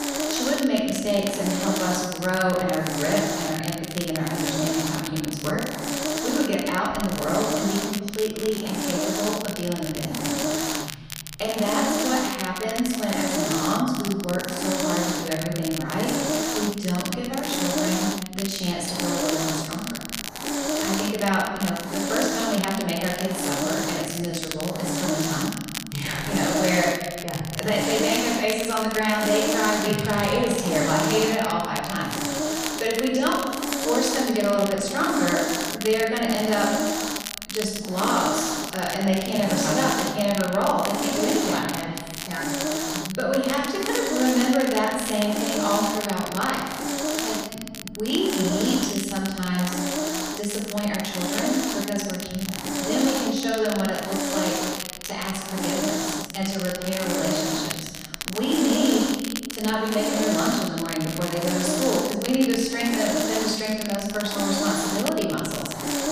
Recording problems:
off-mic speech; far
room echo; noticeable; dies away in 1.3 s
hiss; loud; throughout; 3 dB below the speech
crackle, like an old record; loud; 8 dB below the speech

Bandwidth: 15 kHz